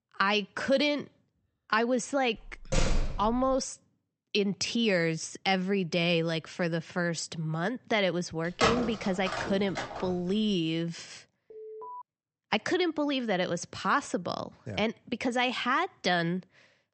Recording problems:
high frequencies cut off; noticeable; nothing above 8 kHz
door banging; noticeable; at 2.5 s; peak 1 dB below the speech
phone ringing; loud; from 8.5 to 10 s; peak 2 dB above the speech
alarm; faint; at 12 s; peak 15 dB below the speech

